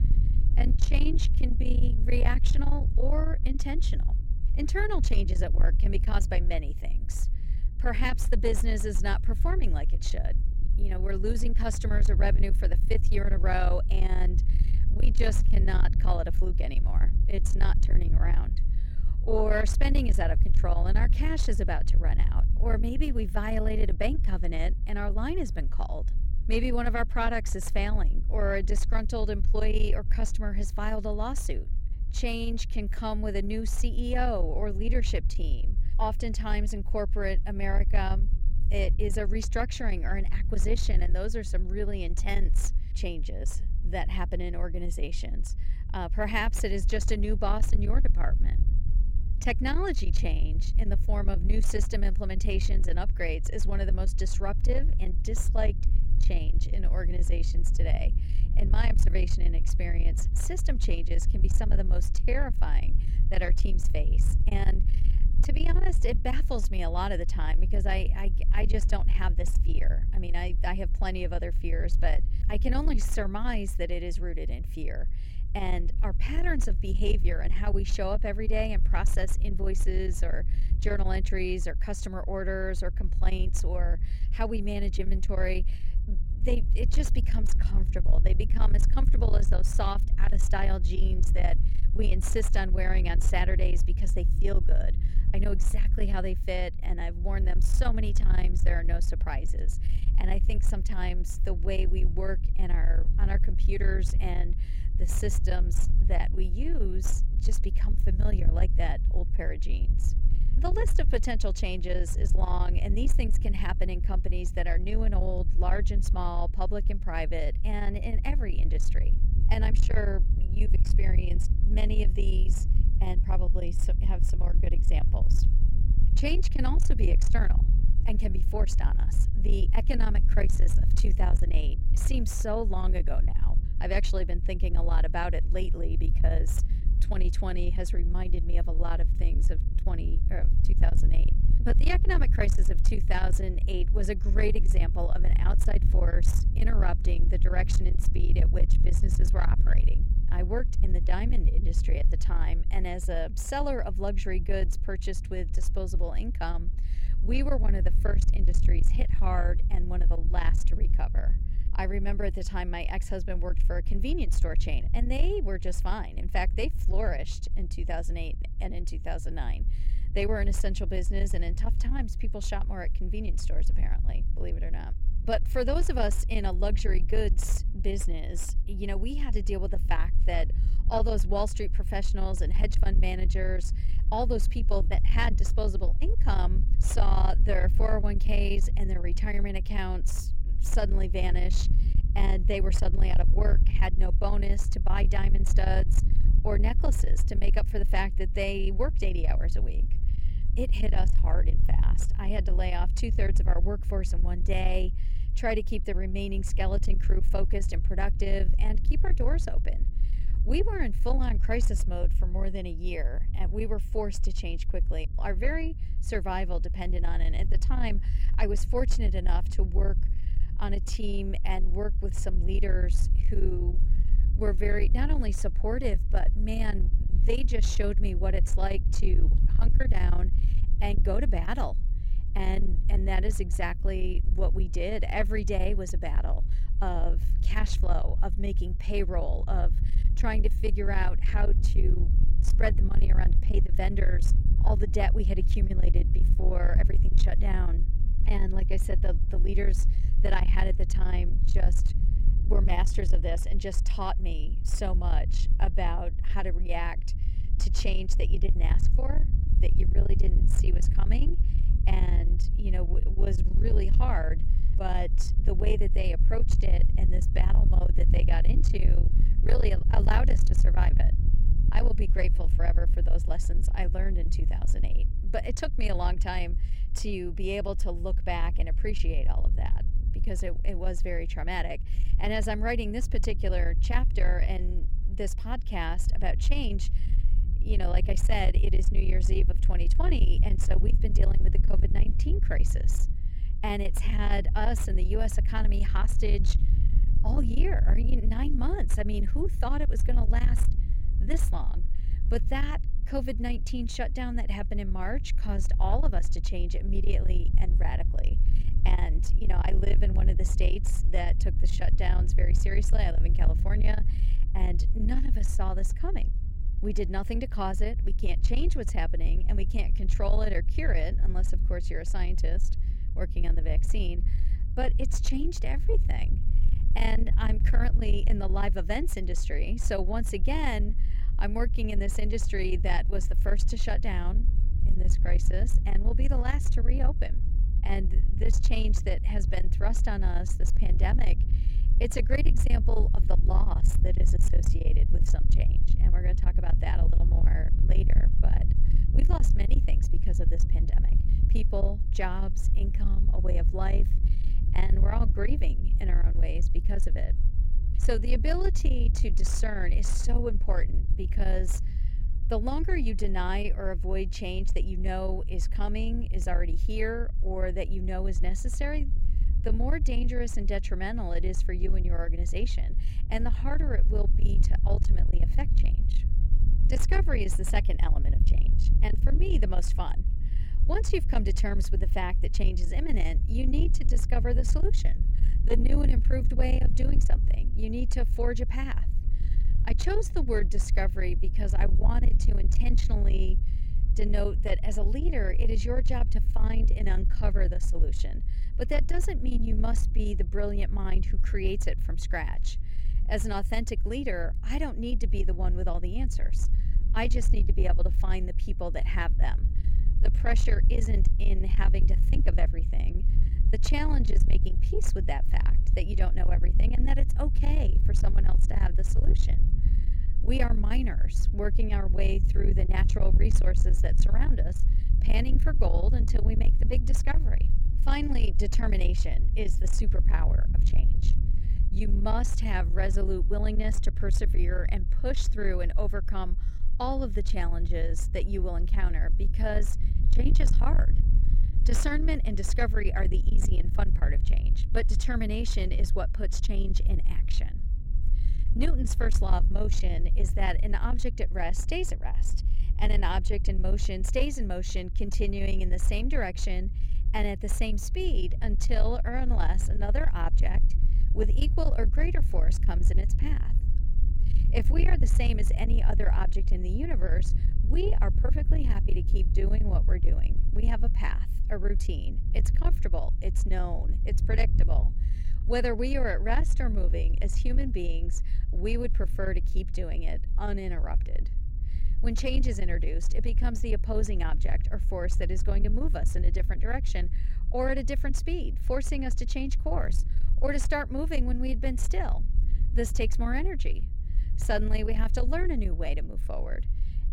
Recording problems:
distortion; slight; 10 dB below the speech
low rumble; noticeable; throughout; 10 dB below the speech

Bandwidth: 16.5 kHz